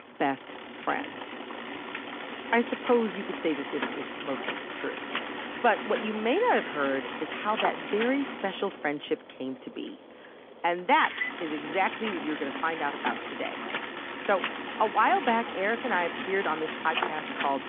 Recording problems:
phone-call audio; nothing above 3.5 kHz
traffic noise; loud; throughout; 5 dB below the speech

